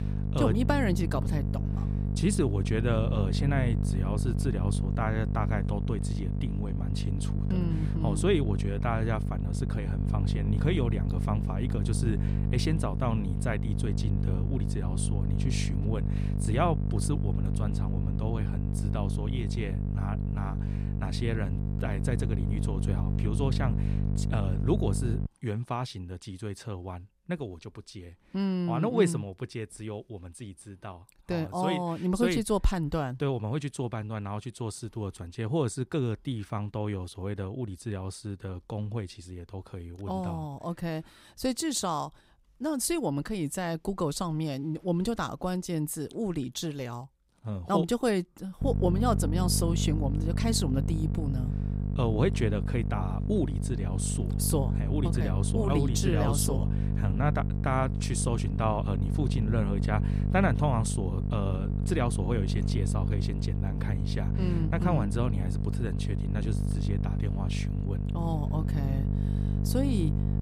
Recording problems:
electrical hum; loud; until 25 s and from 49 s on; 50 Hz, 6 dB below the speech

